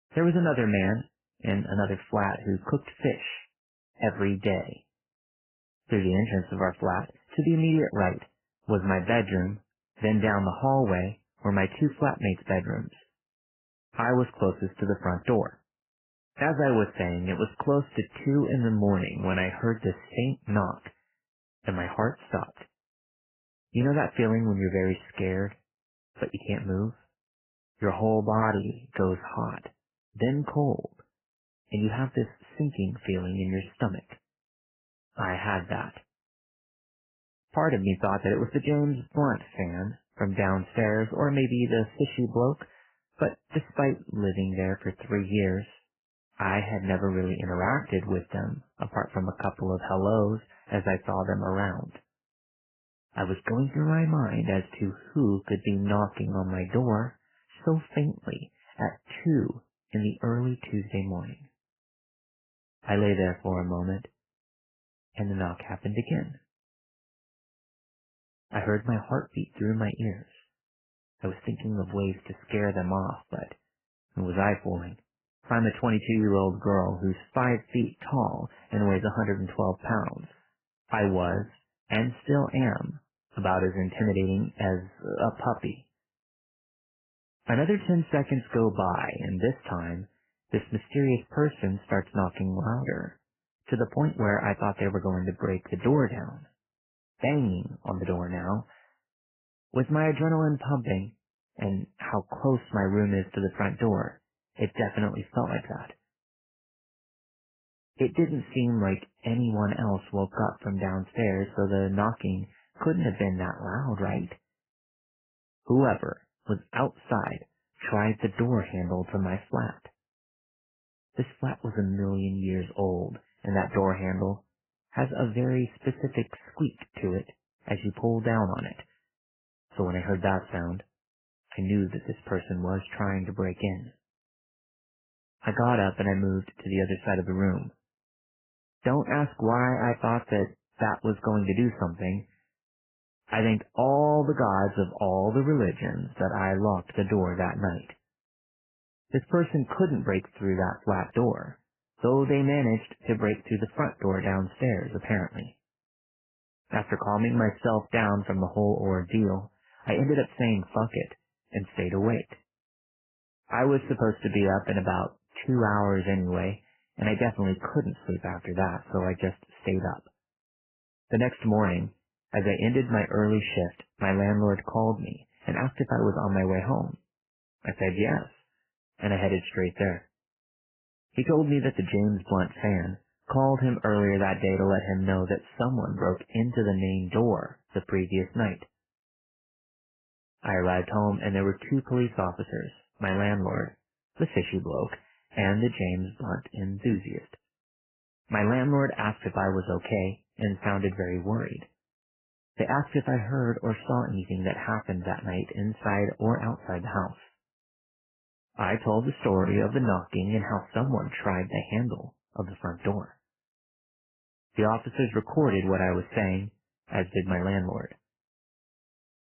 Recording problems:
garbled, watery; badly; nothing above 3 kHz

